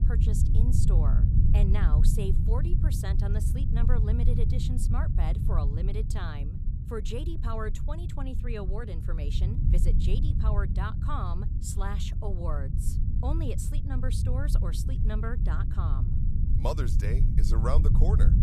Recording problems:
low rumble; loud; throughout; 4 dB below the speech

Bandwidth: 14.5 kHz